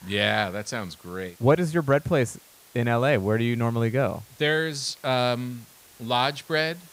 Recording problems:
hiss; faint; throughout; 25 dB below the speech

